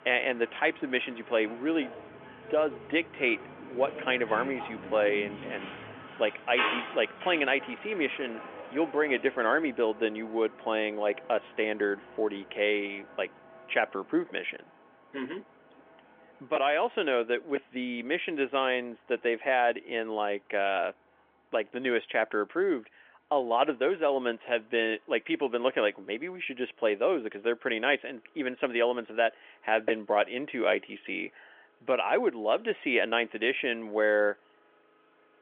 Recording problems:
phone-call audio; nothing above 3.5 kHz
traffic noise; noticeable; throughout; 10 dB below the speech

